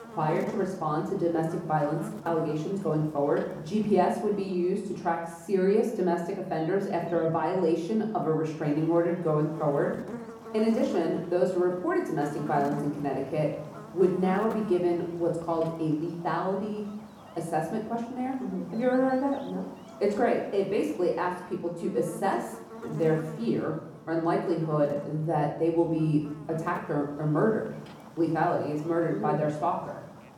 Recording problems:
off-mic speech; far
muffled; slightly; fading above 1.5 kHz
room echo; slight; dies away in 0.7 s
electrical hum; noticeable; throughout; 50 Hz, 15 dB below the speech

